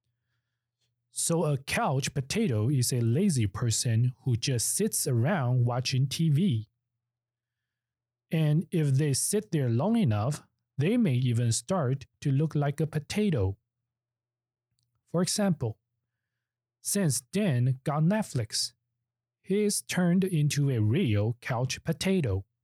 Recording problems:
none

